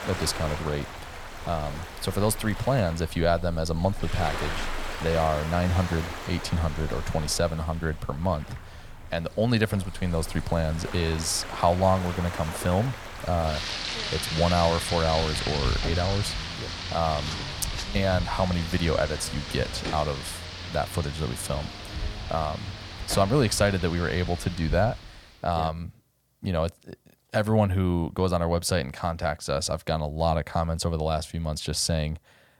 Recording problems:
rain or running water; loud; until 25 s; 7 dB below the speech

